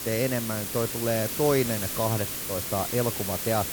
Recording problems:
hiss; loud; throughout; 2 dB below the speech

